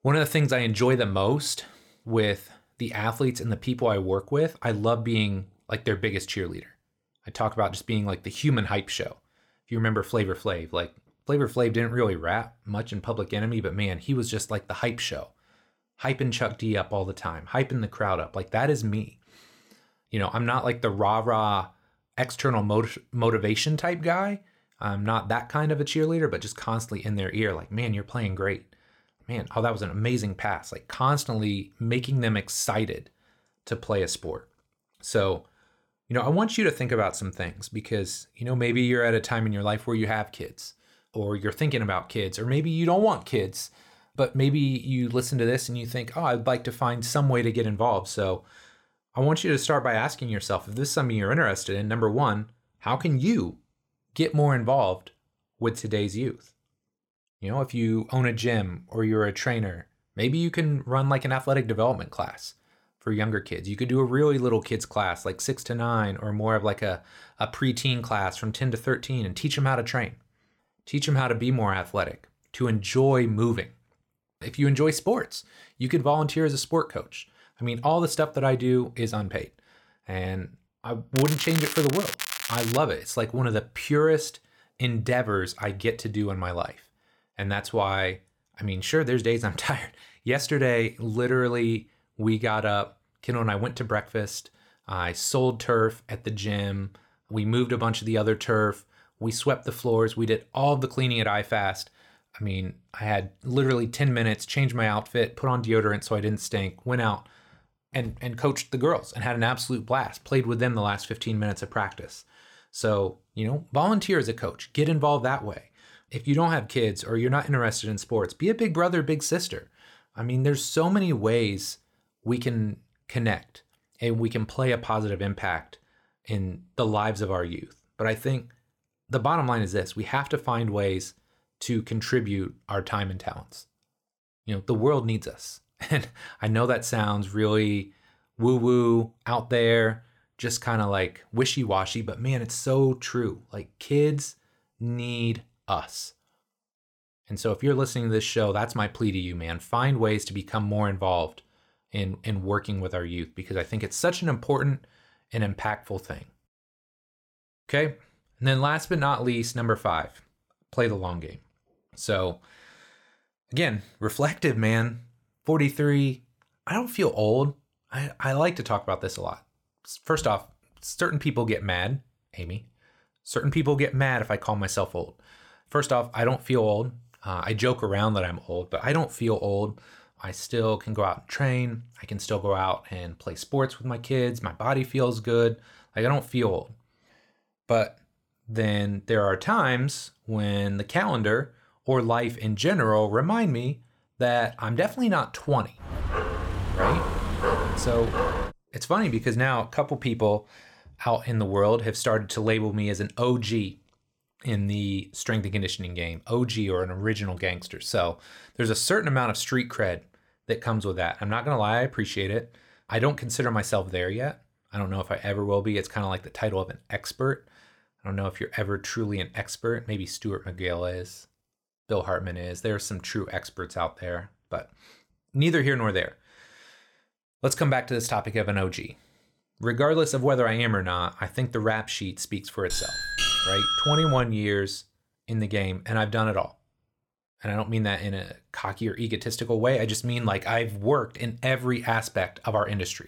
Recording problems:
crackling; loud; from 1:21 to 1:23; 5 dB below the speech
dog barking; loud; from 3:16 to 3:19; peak 1 dB above the speech
doorbell; loud; from 3:53 to 3:54; peak 5 dB above the speech

